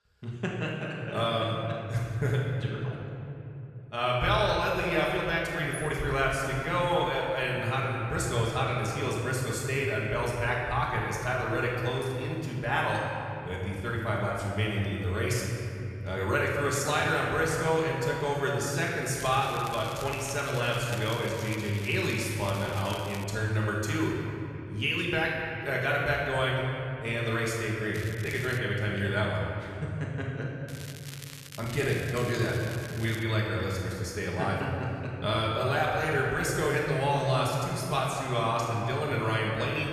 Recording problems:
off-mic speech; far
room echo; noticeable; dies away in 2.9 s
crackling; noticeable; from 19 to 23 s, at 28 s and from 31 to 33 s; 15 dB below the speech

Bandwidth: 14 kHz